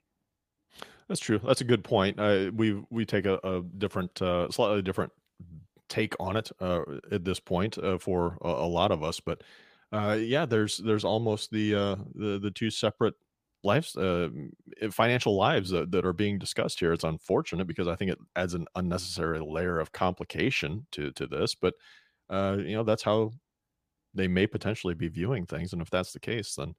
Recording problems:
none

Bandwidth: 15 kHz